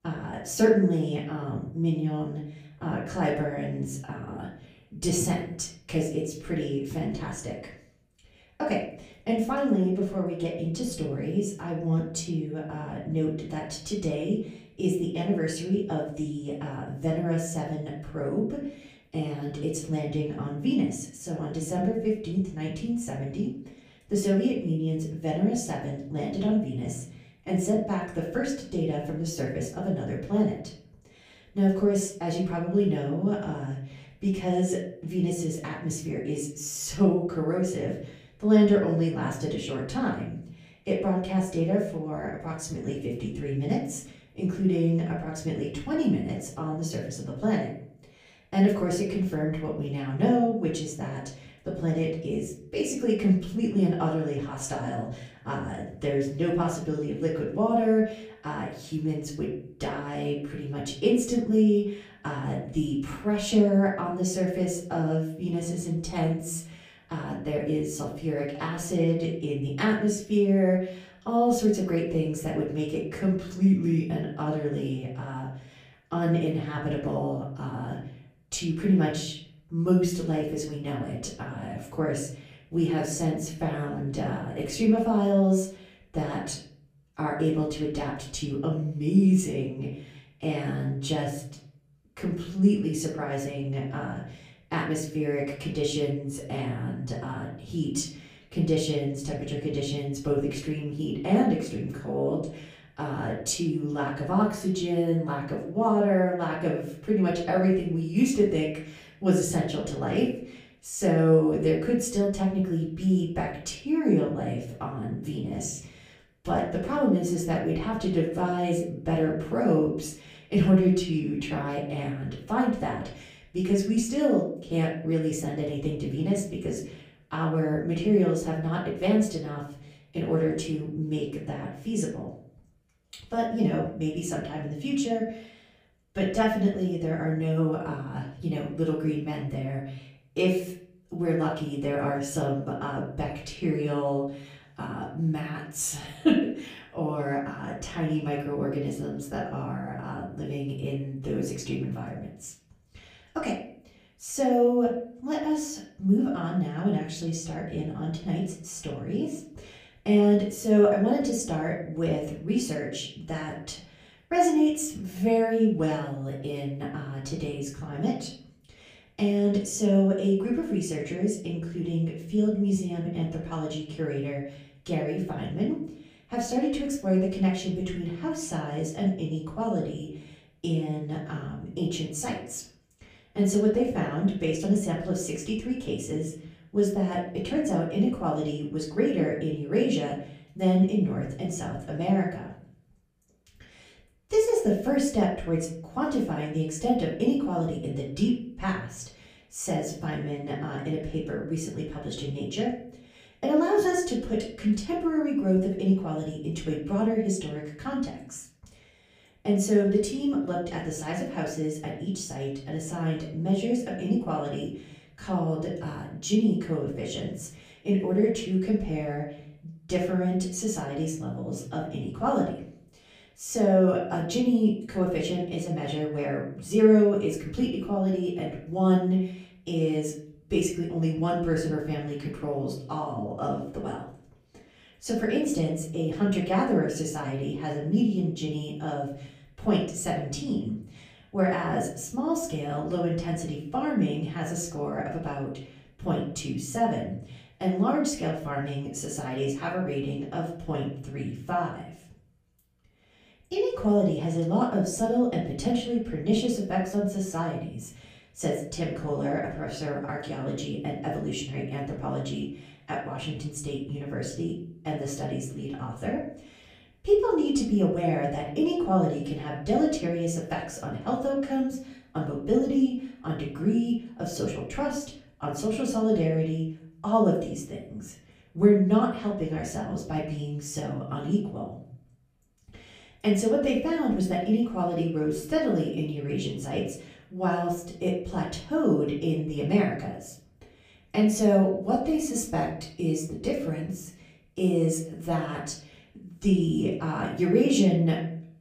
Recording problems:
off-mic speech; far
room echo; slight; dies away in 0.5 s

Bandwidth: 15 kHz